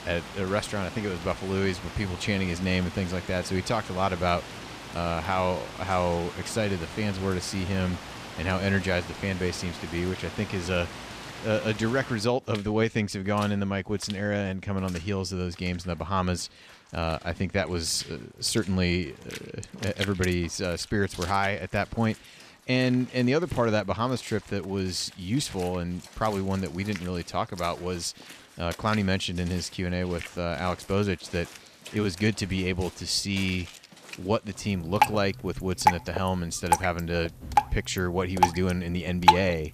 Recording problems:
rain or running water; loud; throughout; 5 dB below the speech

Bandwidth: 14.5 kHz